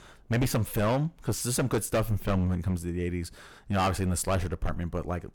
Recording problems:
distortion; heavy; 10% of the sound clipped

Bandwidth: 18 kHz